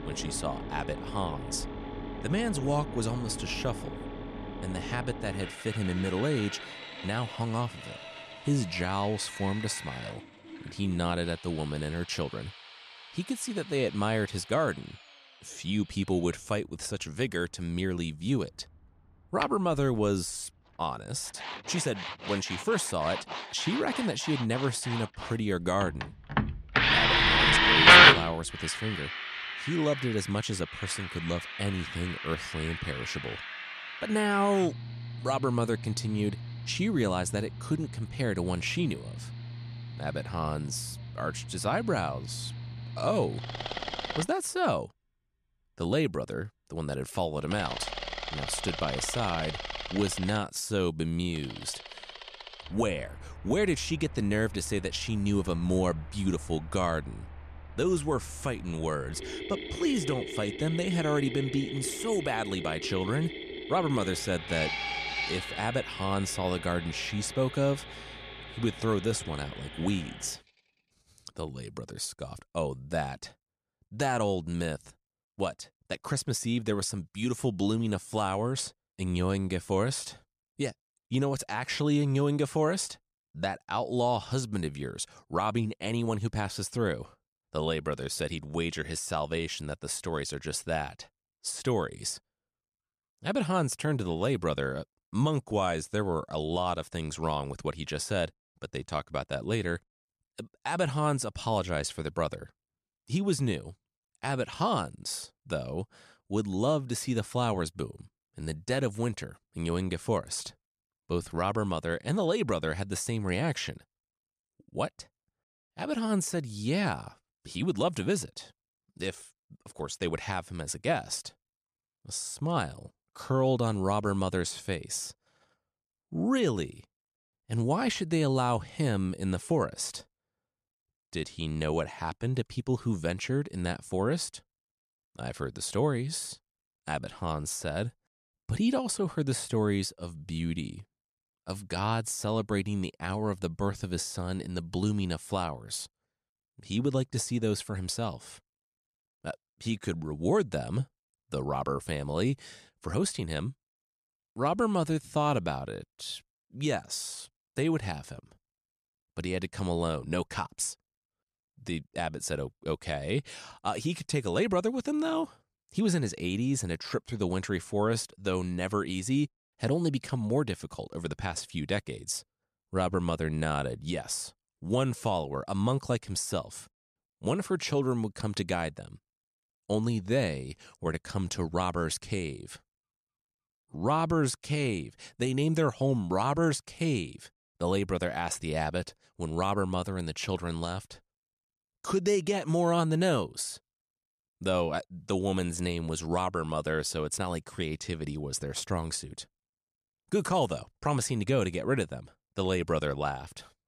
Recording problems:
machinery noise; very loud; until 1:10; 3 dB above the speech

